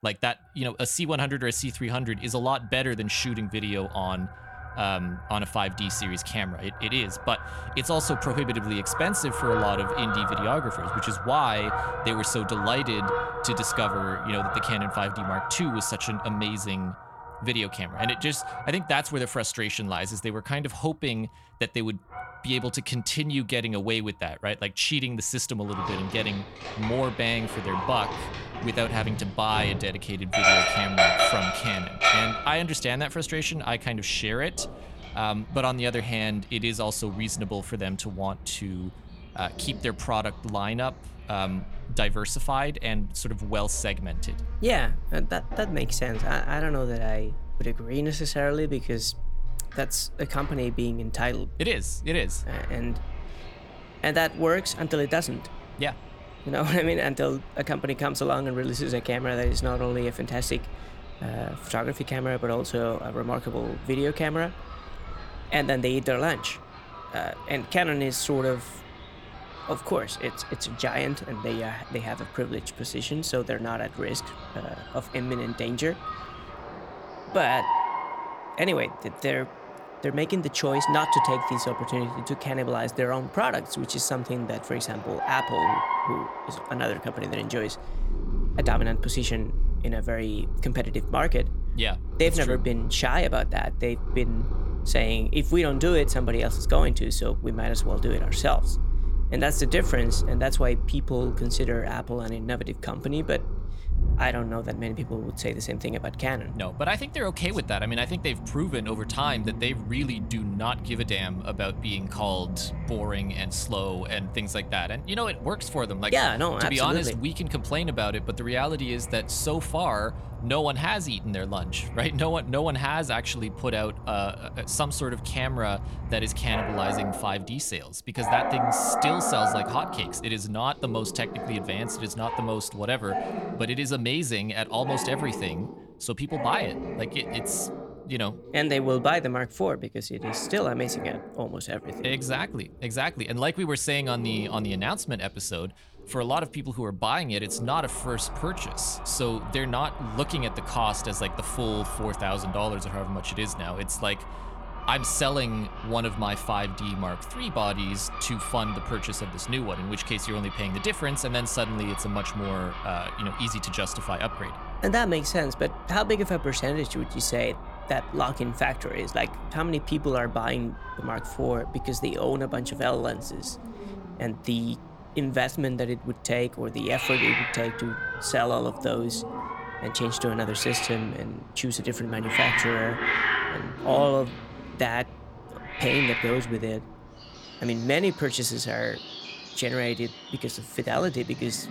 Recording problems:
animal sounds; loud; throughout; 4 dB below the speech

